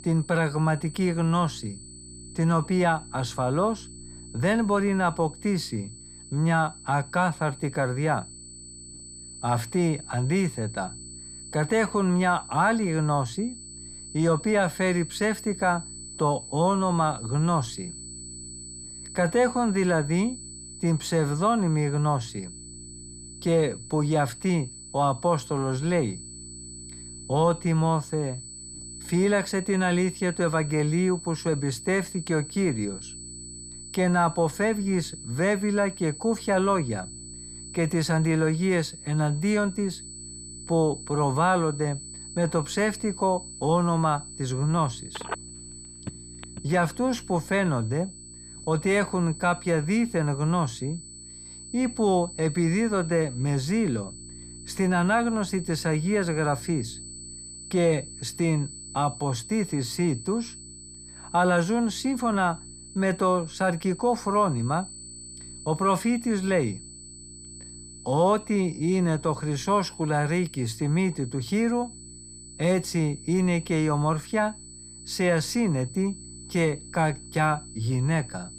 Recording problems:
high-pitched whine; noticeable; throughout; 8 kHz, 15 dB below the speech
electrical hum; faint; throughout; 60 Hz, 30 dB below the speech
phone ringing; faint; from 45 to 47 s; peak 10 dB below the speech

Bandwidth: 15 kHz